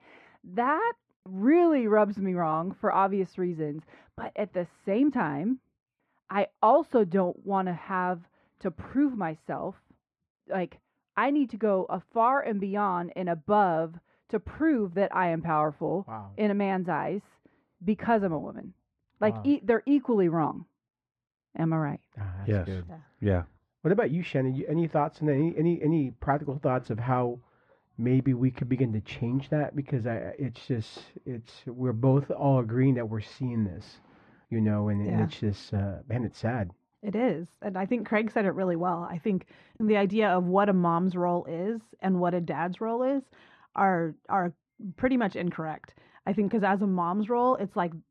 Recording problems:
muffled; very; fading above 1.5 kHz

